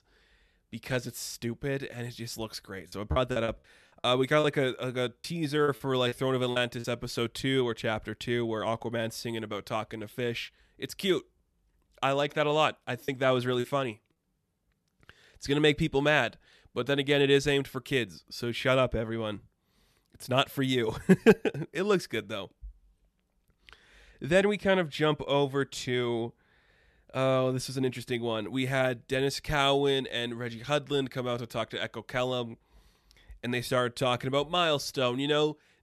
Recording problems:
choppy; very; from 3 to 7 s and at 13 s; 10% of the speech affected

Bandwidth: 13.5 kHz